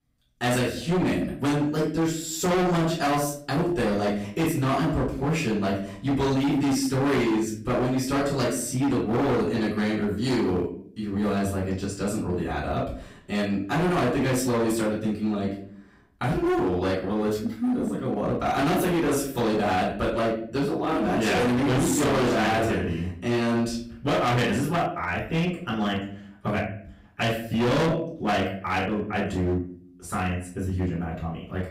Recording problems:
distortion; heavy; 19% of the sound clipped
off-mic speech; far
room echo; noticeable; dies away in 0.5 s

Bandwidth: 15.5 kHz